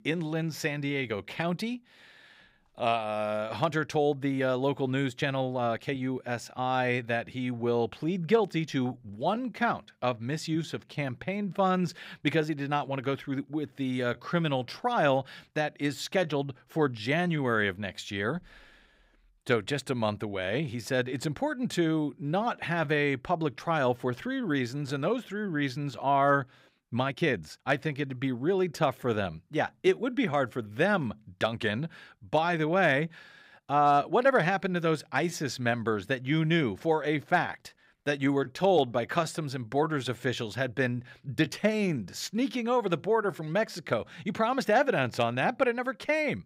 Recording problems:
uneven, jittery; strongly; from 5 to 42 s

